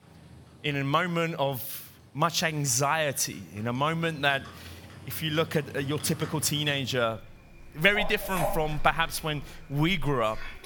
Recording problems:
animal sounds; noticeable; throughout; 15 dB below the speech

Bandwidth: 18.5 kHz